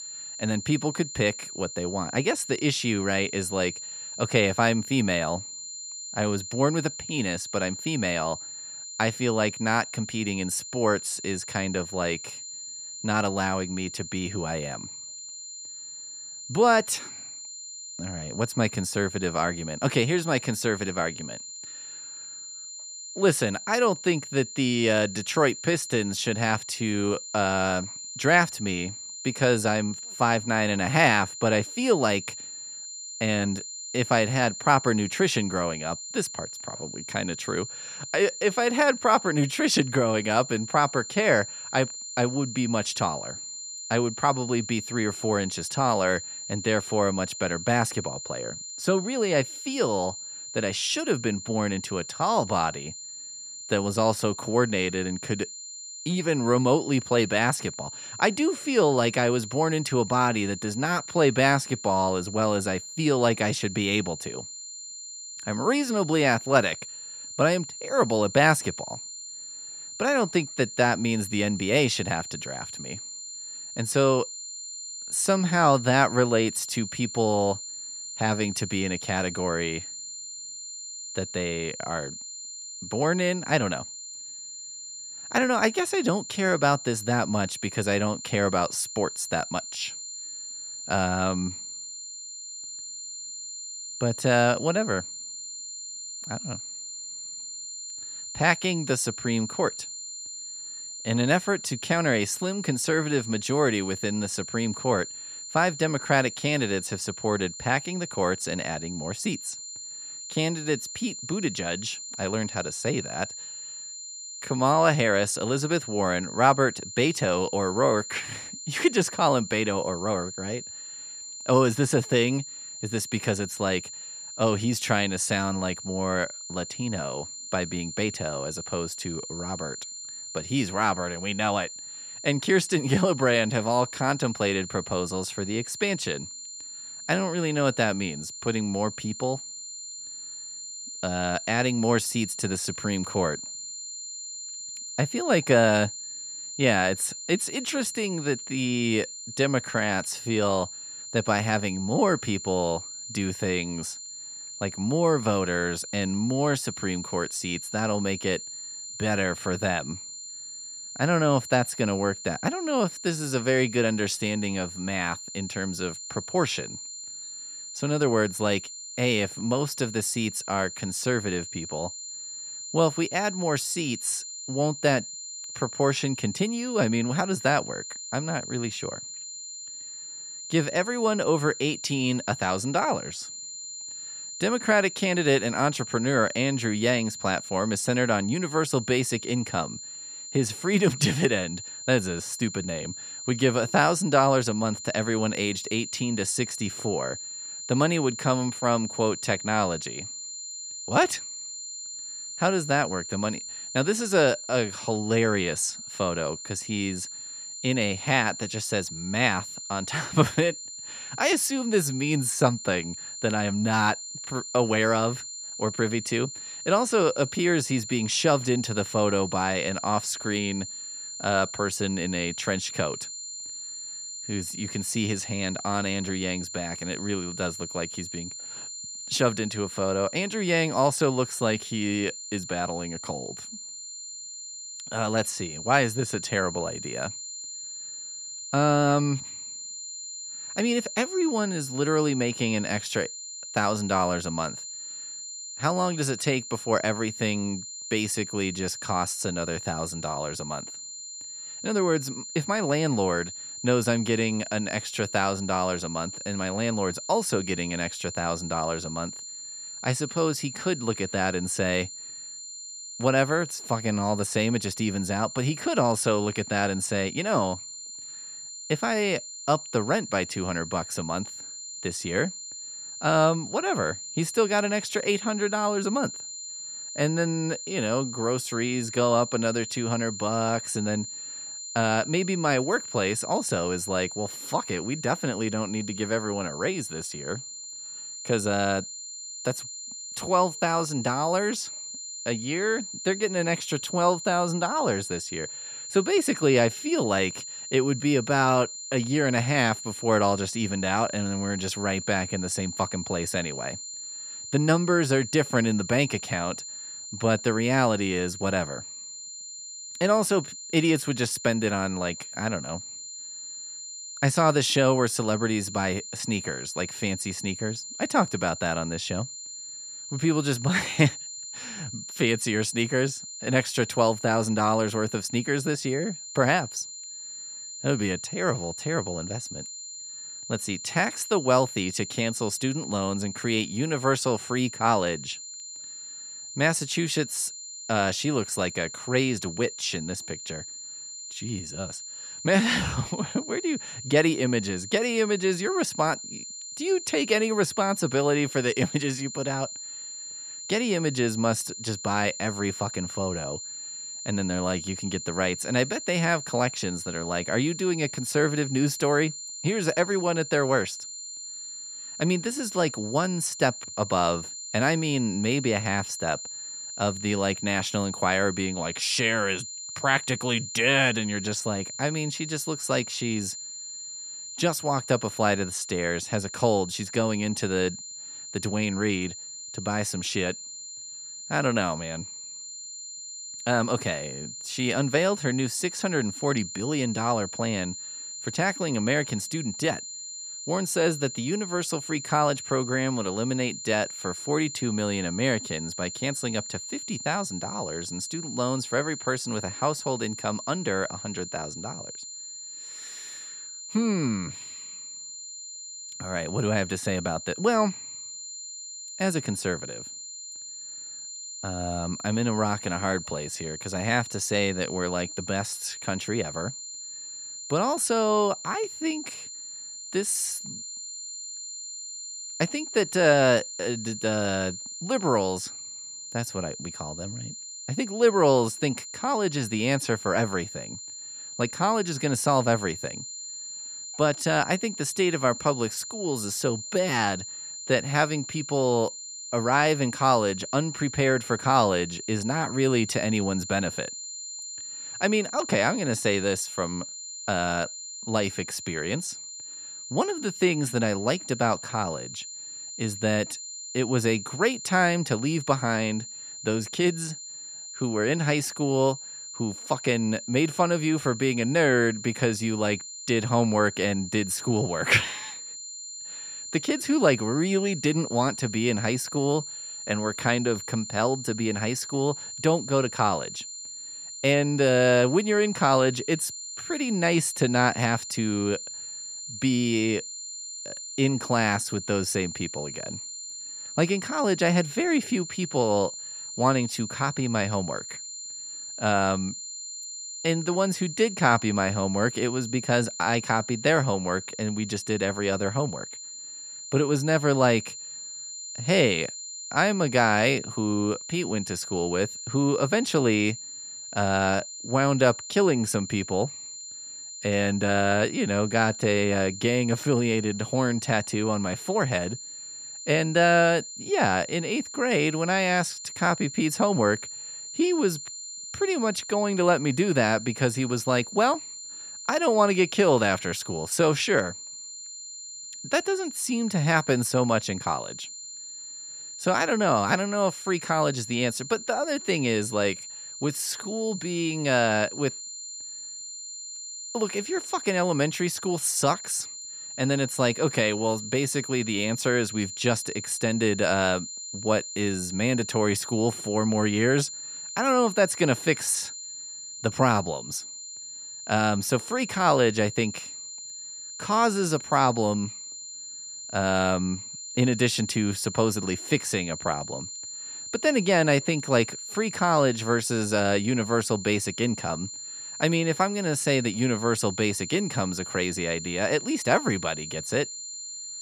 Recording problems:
high-pitched whine; loud; throughout; 7 kHz, 10 dB below the speech

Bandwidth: 14.5 kHz